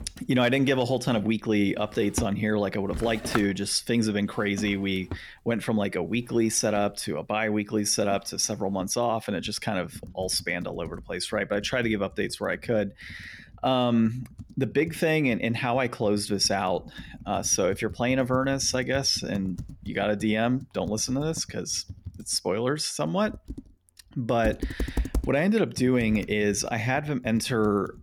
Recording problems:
household noises; noticeable; throughout; 15 dB below the speech

